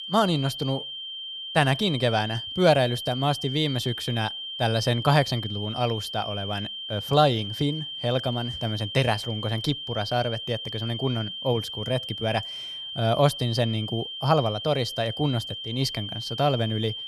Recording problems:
high-pitched whine; loud; throughout; 3 kHz, 7 dB below the speech

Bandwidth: 14.5 kHz